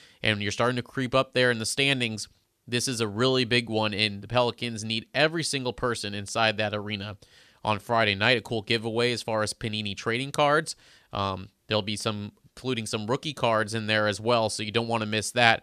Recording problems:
none

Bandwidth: 14 kHz